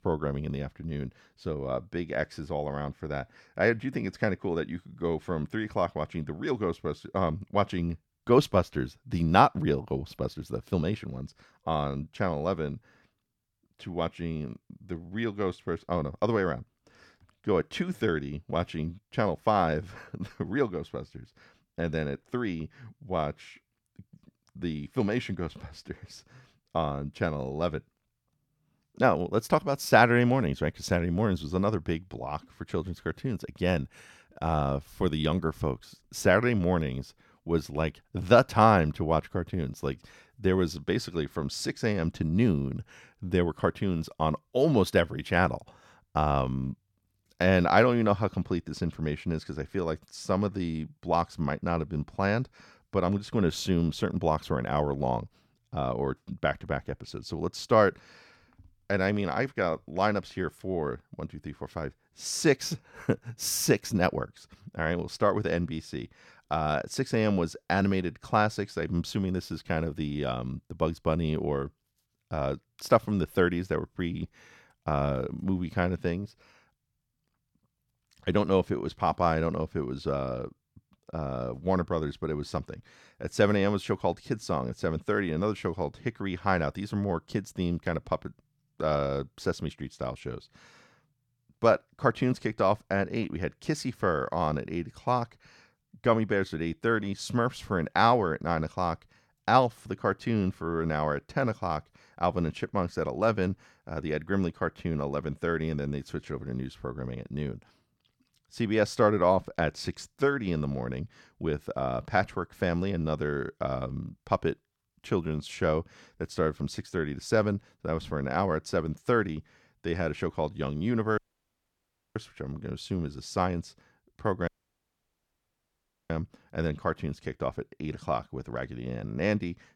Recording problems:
audio cutting out; at 2:01 for 1 s and at 2:04 for 1.5 s

